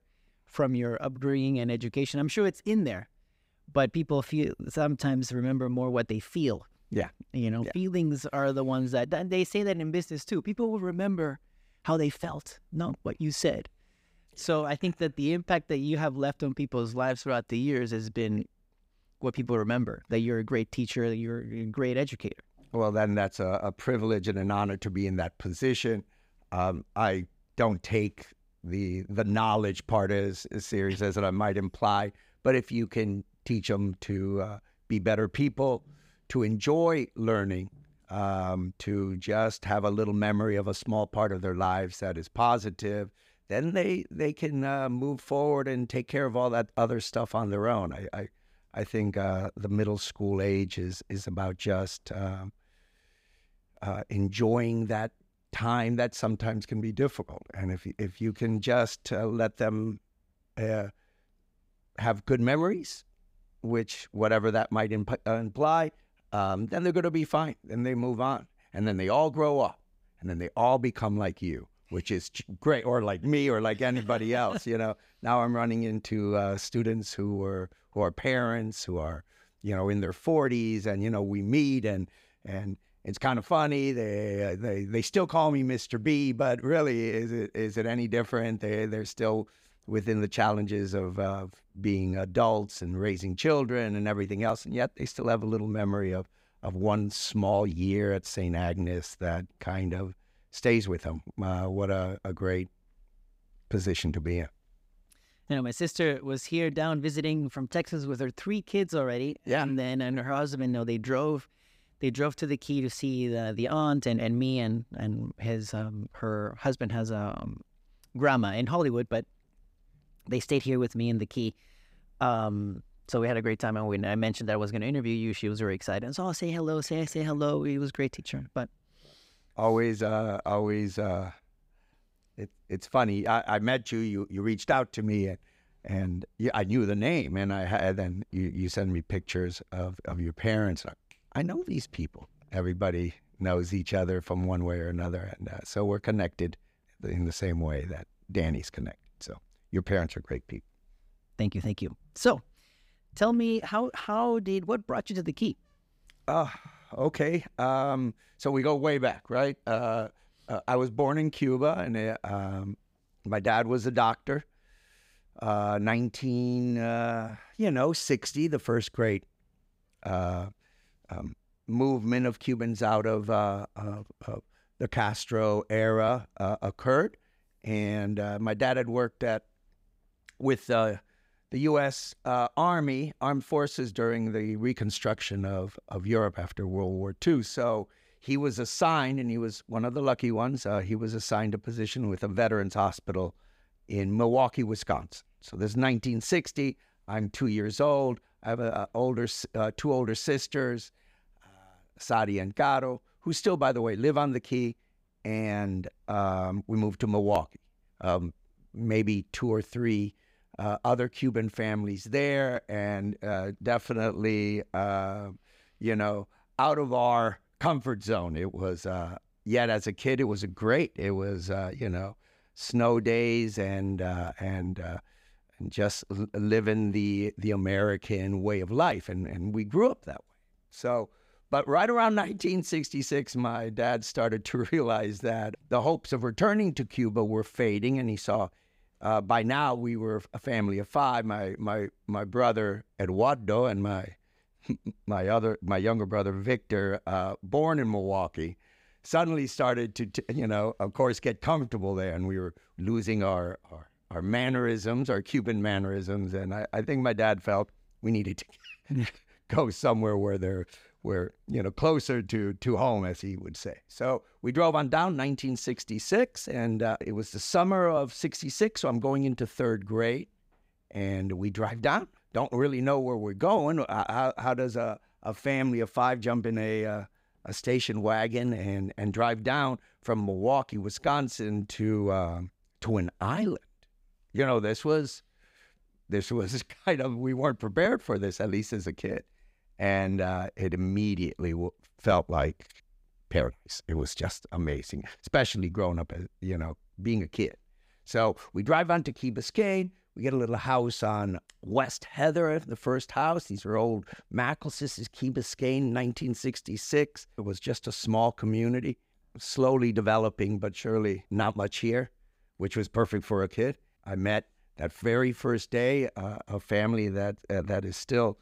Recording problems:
none

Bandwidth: 15.5 kHz